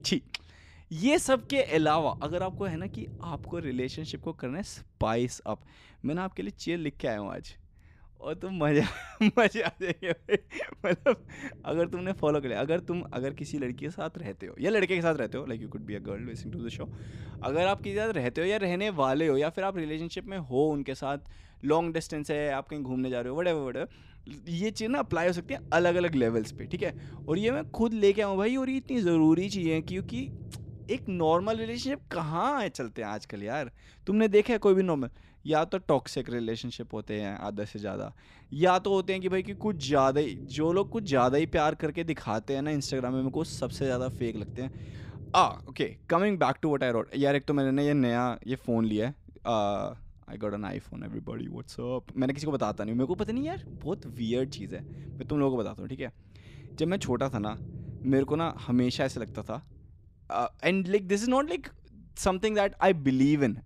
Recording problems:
low rumble; faint; throughout; 25 dB below the speech

